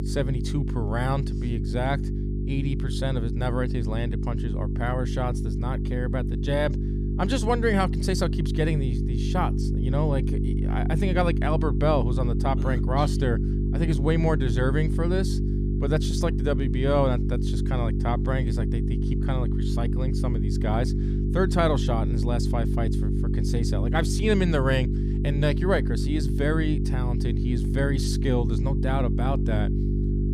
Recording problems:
electrical hum; loud; throughout; 50 Hz, 7 dB below the speech

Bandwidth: 15 kHz